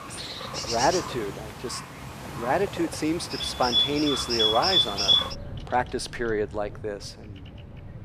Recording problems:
animal sounds; very loud; throughout; 4 dB above the speech

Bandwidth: 14.5 kHz